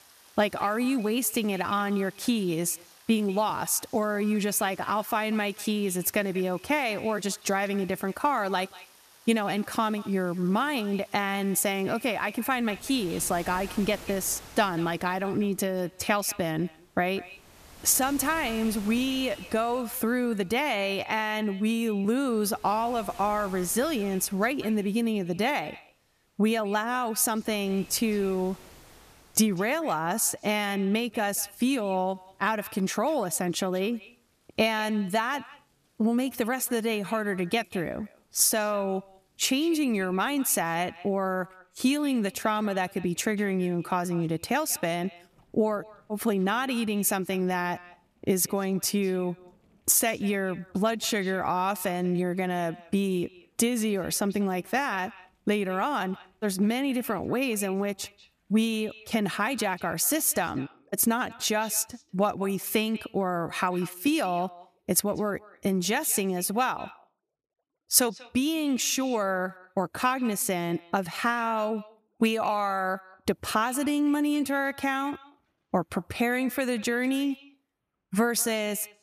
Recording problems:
echo of what is said; faint; throughout; 190 ms later, 20 dB below the speech
rain or running water; faint; throughout; 25 dB below the speech

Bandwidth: 14.5 kHz